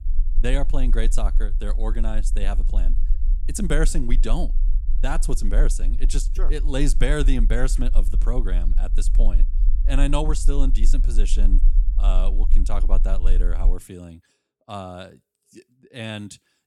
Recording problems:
low rumble; noticeable; until 14 s; 20 dB below the speech

